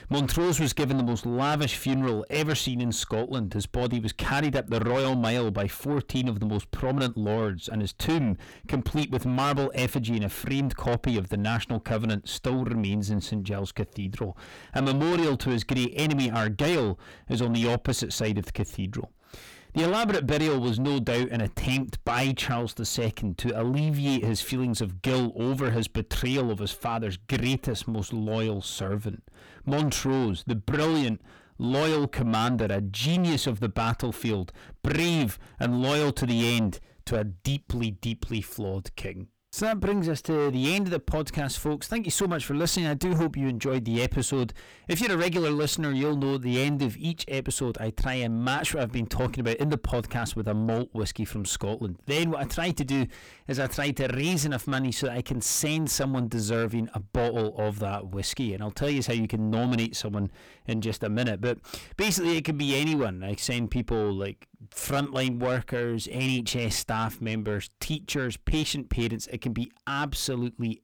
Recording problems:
distortion; heavy; 7 dB below the speech

